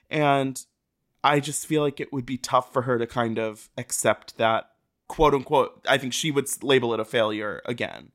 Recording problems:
none

